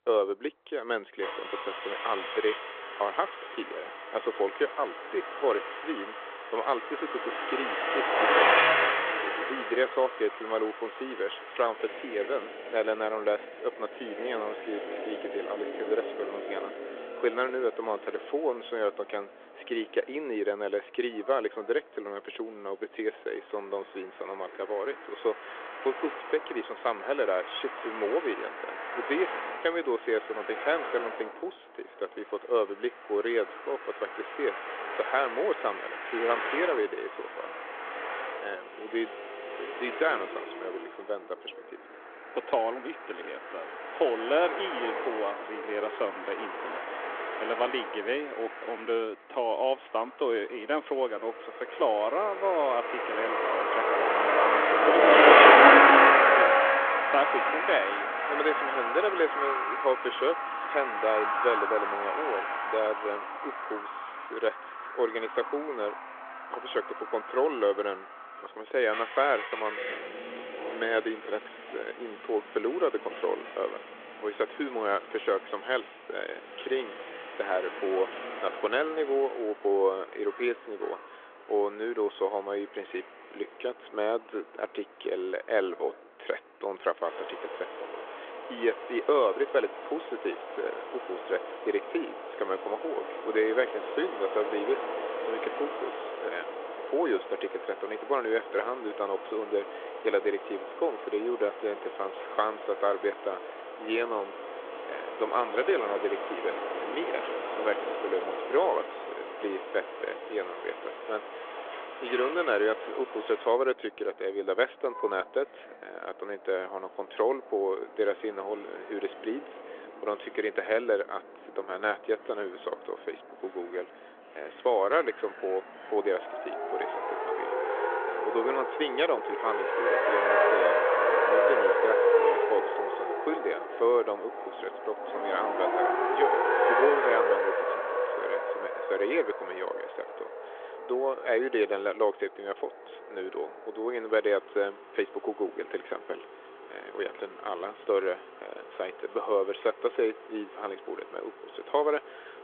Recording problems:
phone-call audio; nothing above 3.5 kHz
traffic noise; very loud; throughout; 3 dB above the speech

